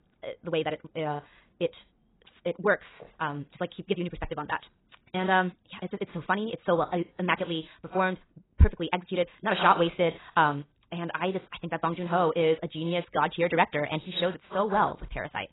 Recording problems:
garbled, watery; badly; nothing above 4 kHz
wrong speed, natural pitch; too fast; 1.7 times normal speed

